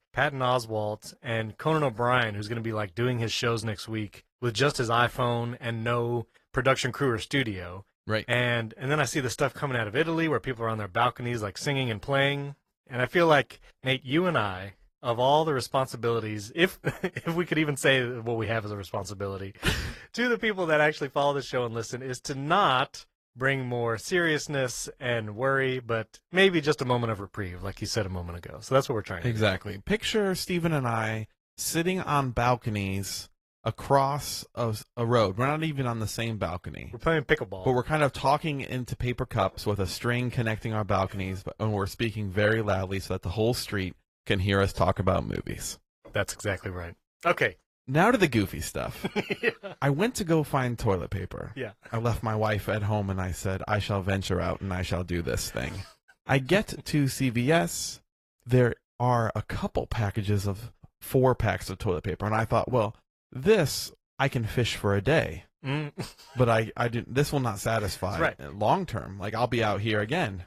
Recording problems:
garbled, watery; slightly; nothing above 13 kHz

